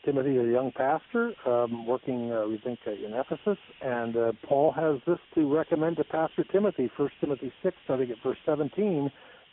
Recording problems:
phone-call audio; poor line; nothing above 3.5 kHz
muffled; very slightly; fading above 1.5 kHz
hiss; faint; throughout; 25 dB below the speech

